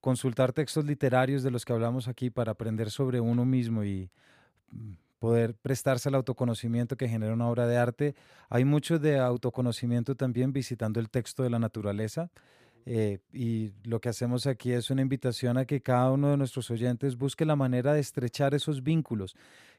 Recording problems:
none

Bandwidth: 15 kHz